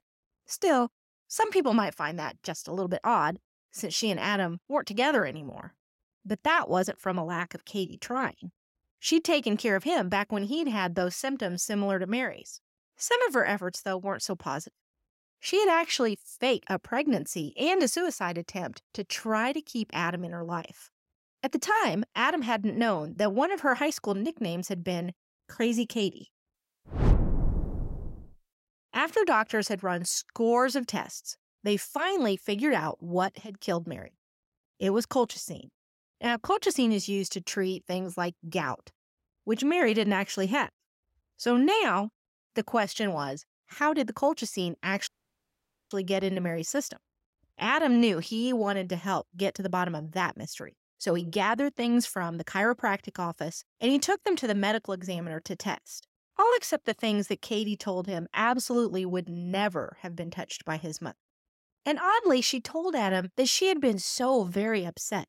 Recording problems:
audio cutting out; at 45 s for 1 s

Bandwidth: 16 kHz